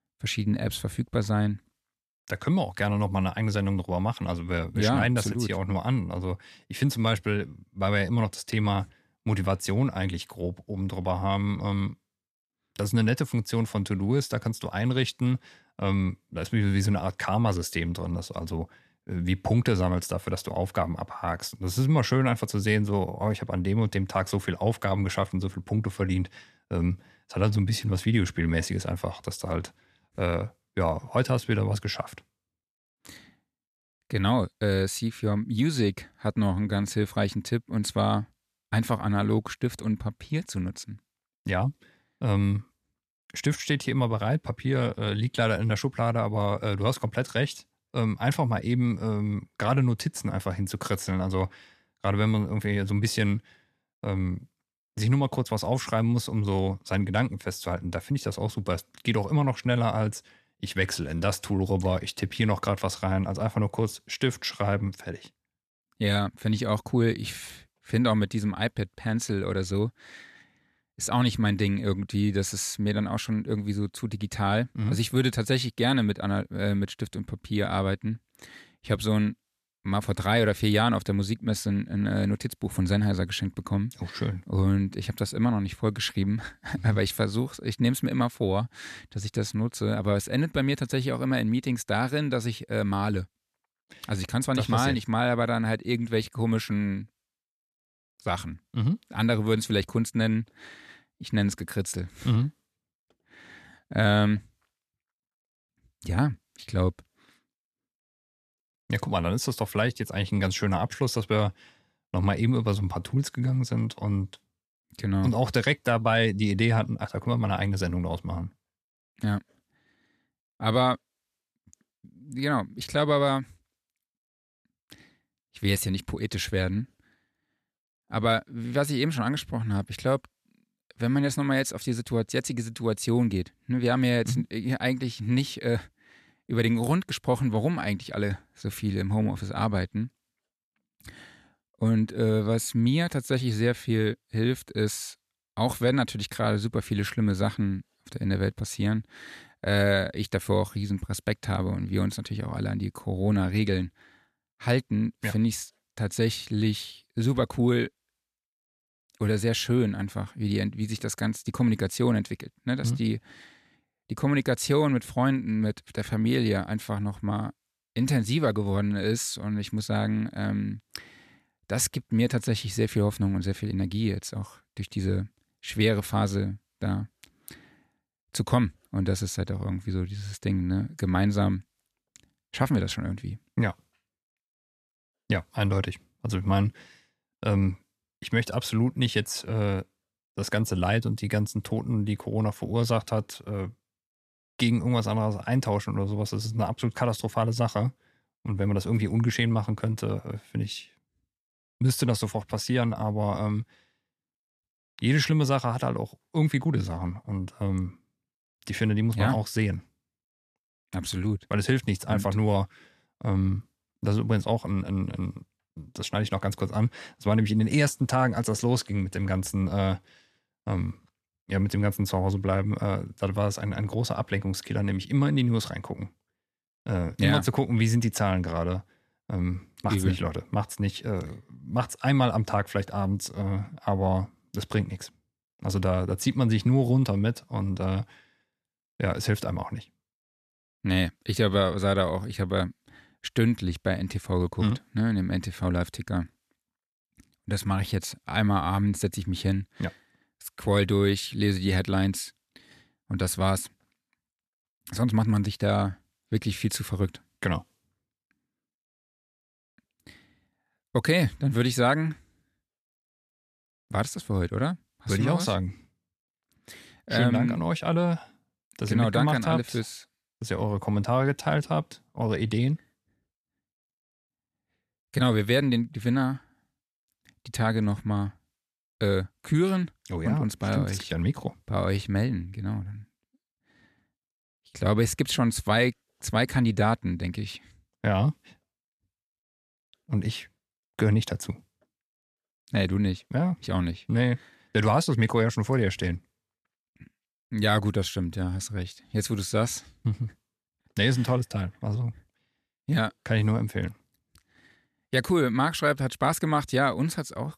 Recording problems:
none

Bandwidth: 14 kHz